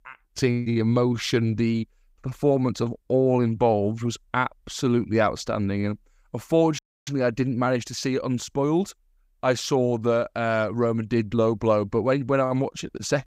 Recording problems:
audio cutting out; at 7 s

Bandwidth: 15.5 kHz